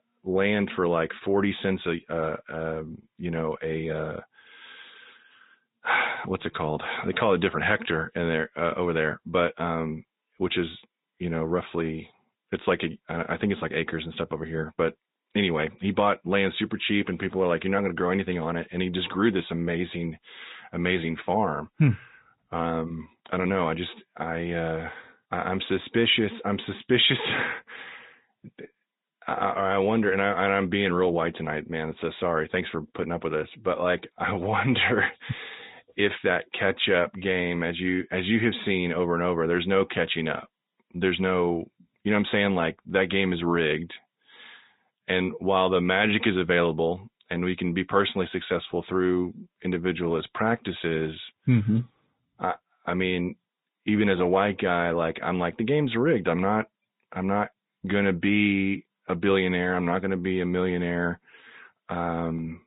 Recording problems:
high frequencies cut off; severe; nothing above 4 kHz
garbled, watery; slightly

